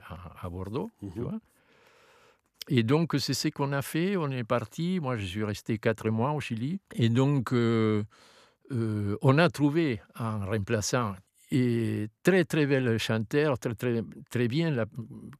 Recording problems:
none

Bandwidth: 14.5 kHz